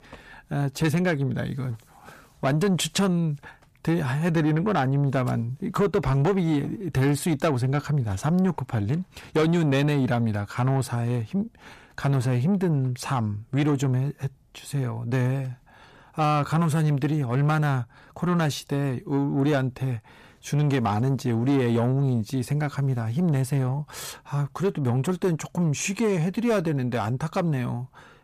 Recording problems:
distortion; slight; 10 dB below the speech

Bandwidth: 14.5 kHz